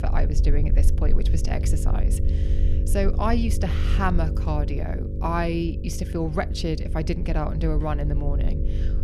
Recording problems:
electrical hum; noticeable; throughout; 50 Hz, 10 dB below the speech
low rumble; noticeable; throughout; 15 dB below the speech

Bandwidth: 14.5 kHz